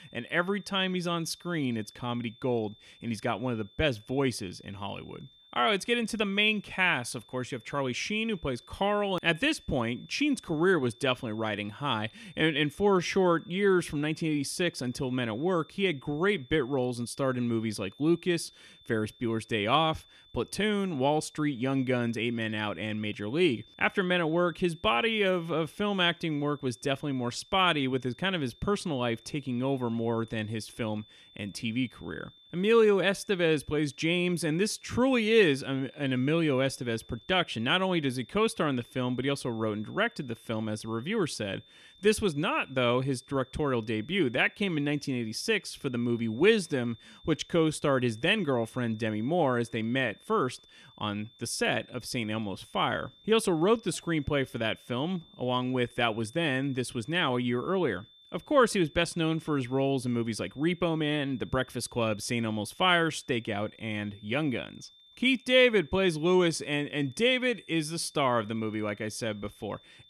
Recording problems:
high-pitched whine; faint; throughout; 3.5 kHz, 25 dB below the speech

